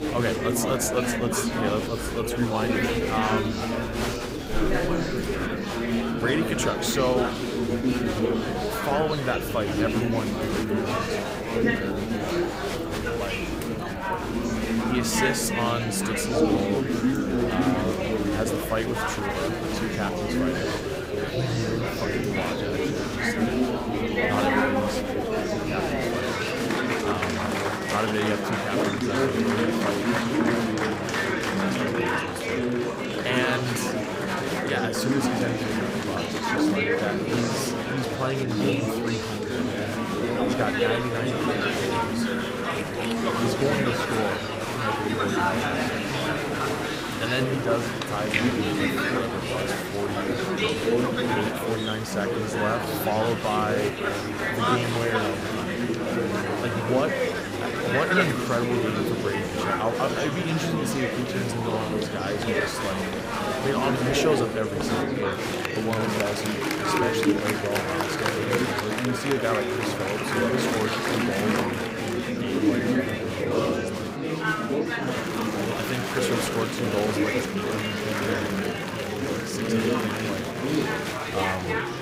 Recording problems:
murmuring crowd; very loud; throughout; 4 dB above the speech

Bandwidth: 15.5 kHz